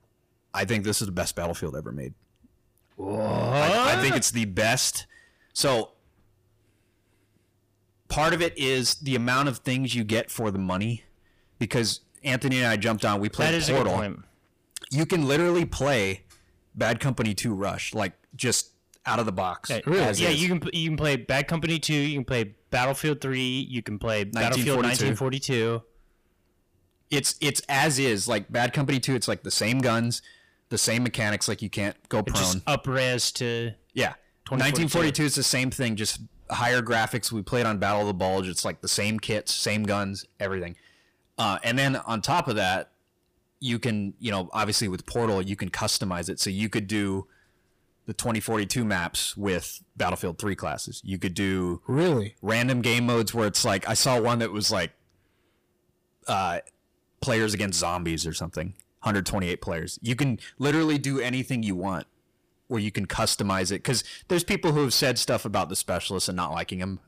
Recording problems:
distortion; heavy; 7 dB below the speech

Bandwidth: 15 kHz